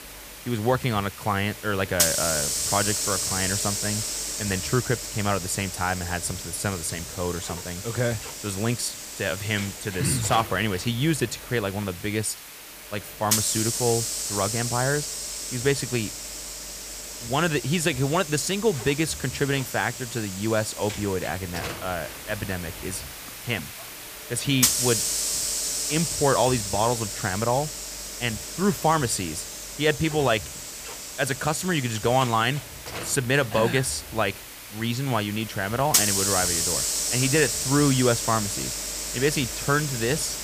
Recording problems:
hiss; loud; throughout; 2 dB below the speech

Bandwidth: 15 kHz